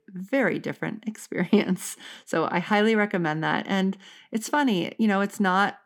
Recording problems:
none

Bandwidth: 19 kHz